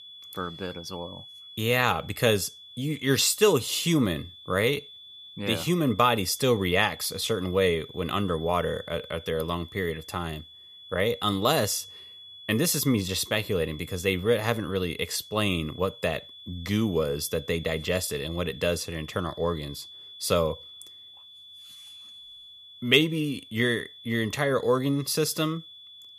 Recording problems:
high-pitched whine; noticeable; throughout; 3.5 kHz, 15 dB below the speech

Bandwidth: 14.5 kHz